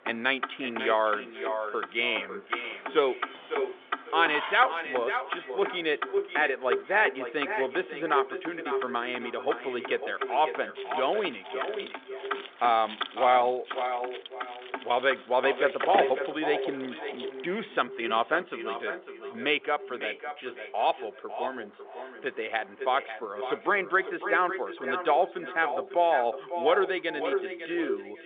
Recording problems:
echo of what is said; strong; throughout; 550 ms later, 7 dB below the speech
phone-call audio
traffic noise; noticeable; throughout; 10 dB below the speech
jangling keys; noticeable; from 2.5 to 4.5 s and from 11 to 17 s; peak 5 dB below the speech

